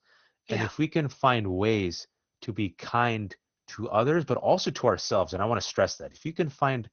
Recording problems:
garbled, watery; slightly; nothing above 6.5 kHz

